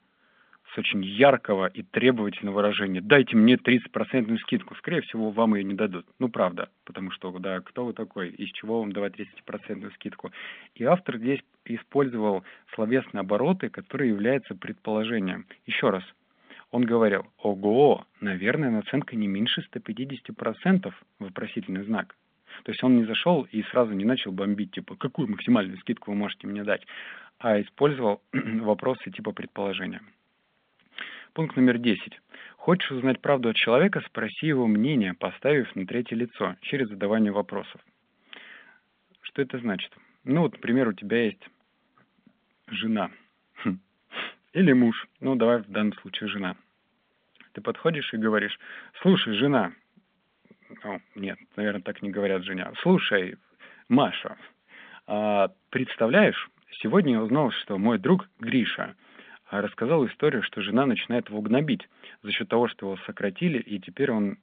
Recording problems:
phone-call audio; nothing above 3.5 kHz

